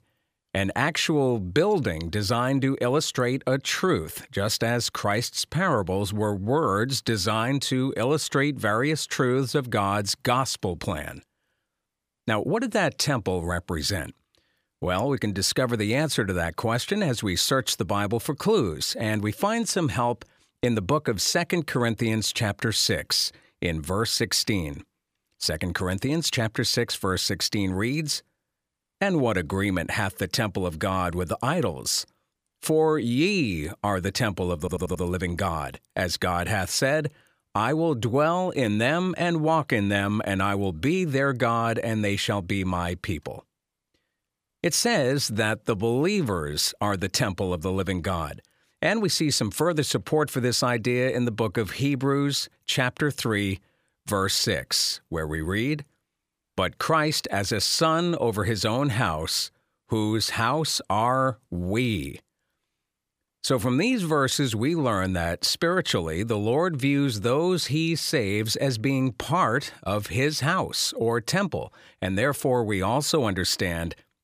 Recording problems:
audio stuttering; at 35 s

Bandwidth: 15 kHz